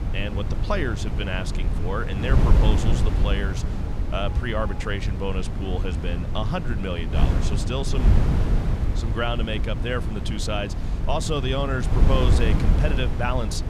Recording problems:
wind noise on the microphone; heavy; 6 dB below the speech
alarms or sirens; faint; throughout; 20 dB below the speech

